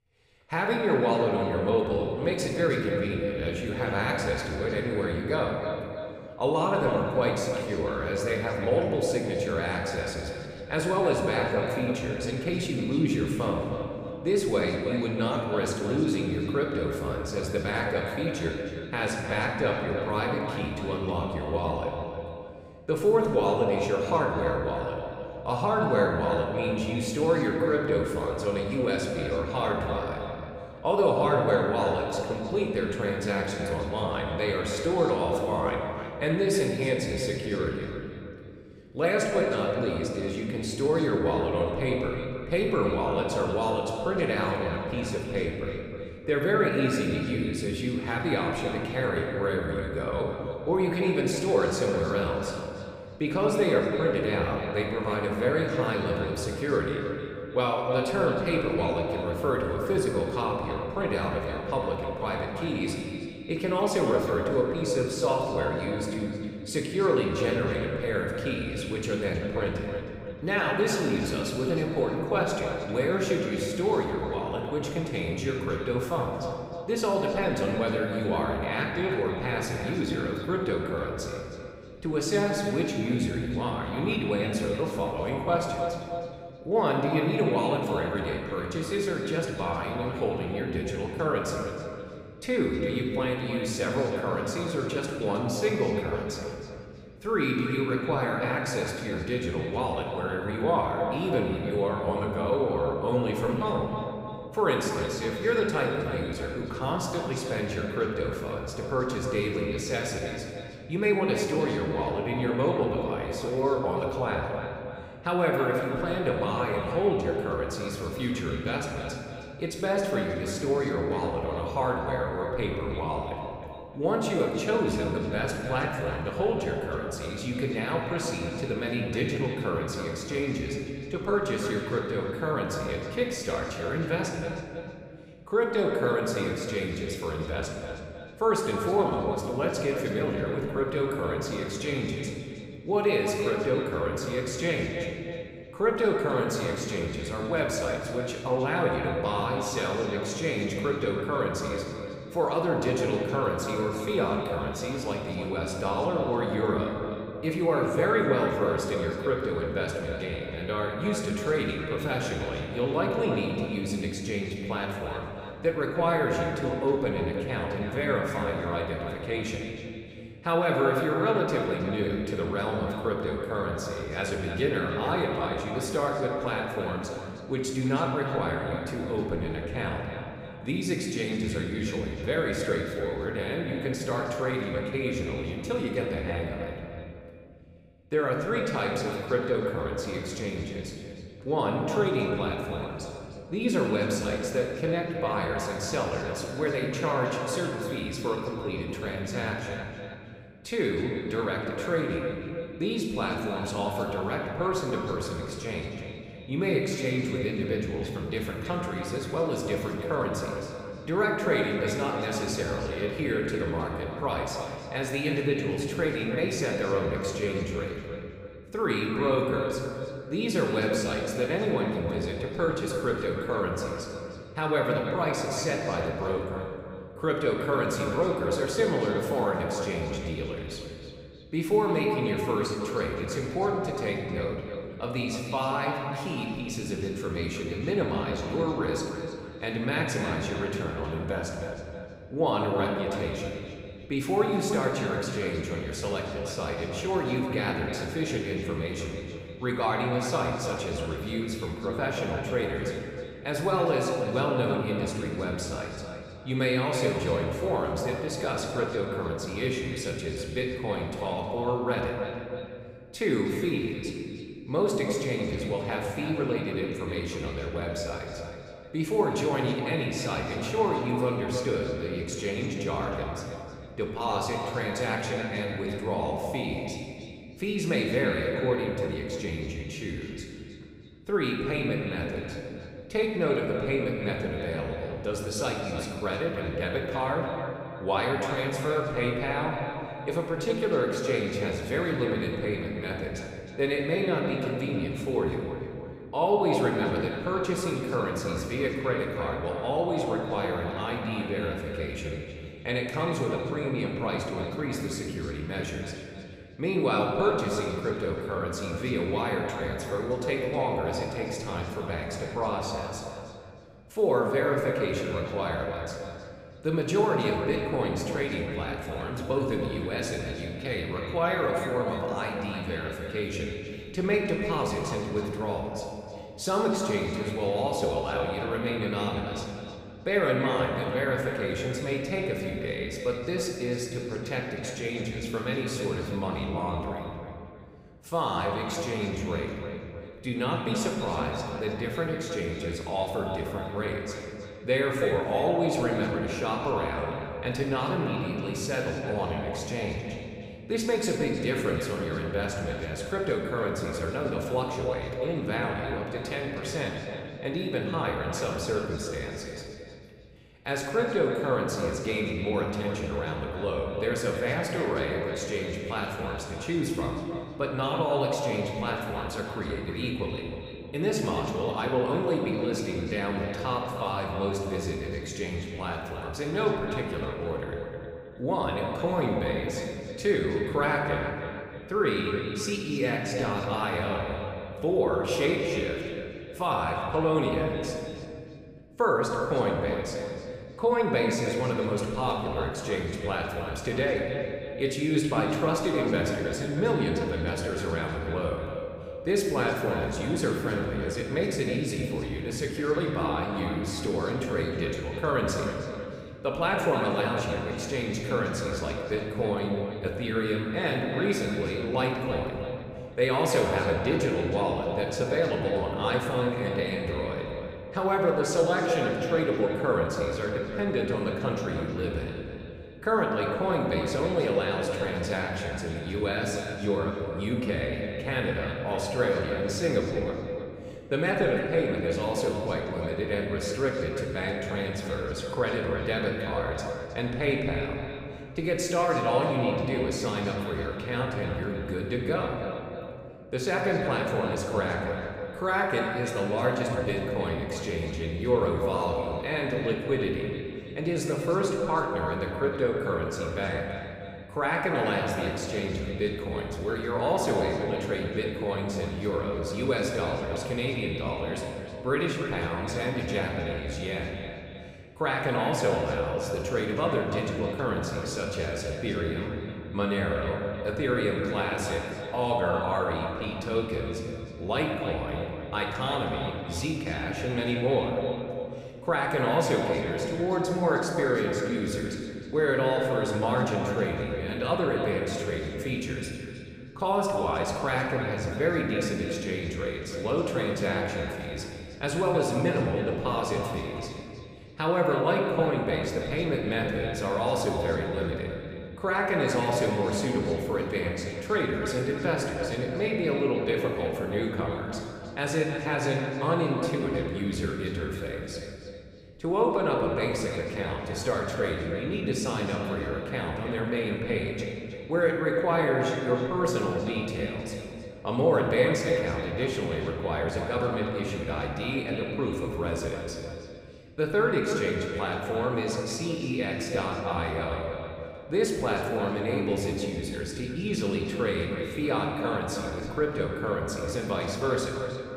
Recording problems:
echo of what is said; strong; throughout; 310 ms later, 8 dB below the speech
room echo; noticeable; dies away in 1.8 s
off-mic speech; somewhat distant

